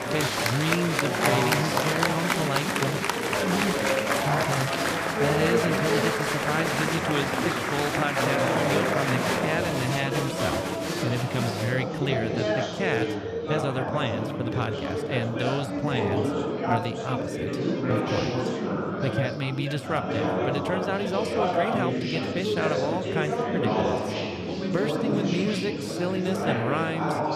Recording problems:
chatter from many people; very loud; throughout; 4 dB above the speech

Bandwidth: 14.5 kHz